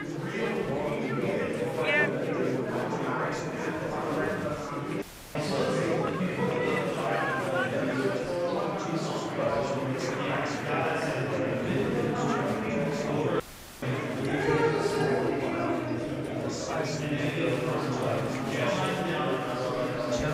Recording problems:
room echo; strong; dies away in 2.5 s
off-mic speech; far
chatter from many people; very loud; throughout; 1 dB above the speech
audio cutting out; filled with static; at 5 s and at 13 s

